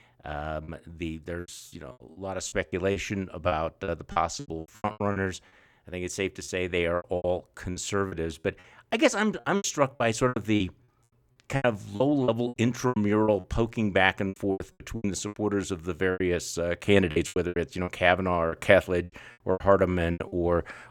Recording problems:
choppy; very; 15% of the speech affected

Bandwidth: 17.5 kHz